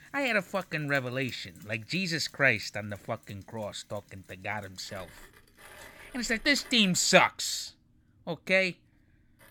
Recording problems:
machinery noise; faint; throughout; 25 dB below the speech

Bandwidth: 17 kHz